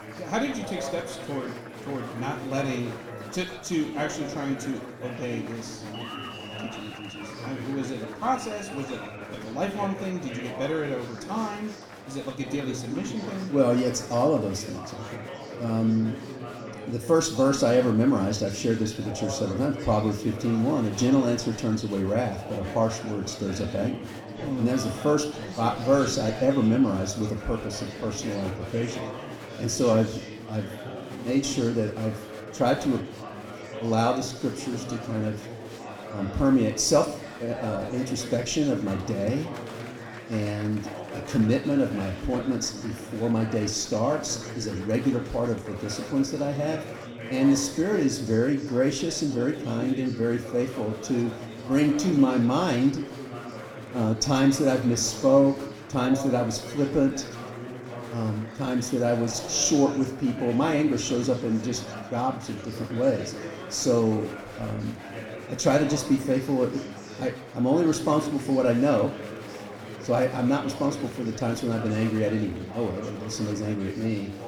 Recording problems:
room echo; slight; dies away in 0.6 s
off-mic speech; somewhat distant
chatter from many people; noticeable; throughout; 10 dB below the speech

